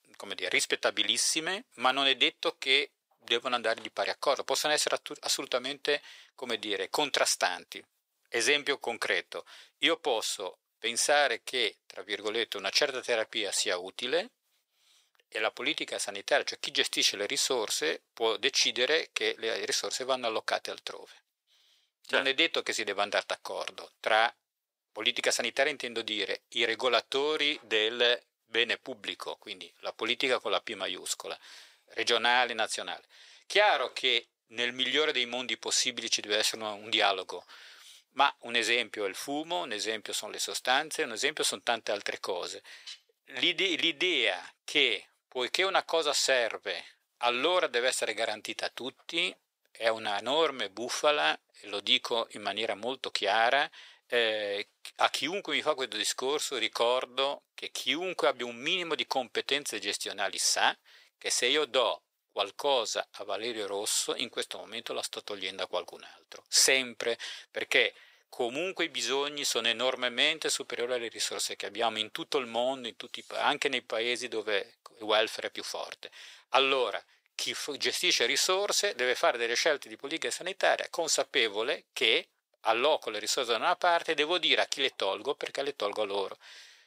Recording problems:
thin; very; fading below 600 Hz

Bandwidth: 15.5 kHz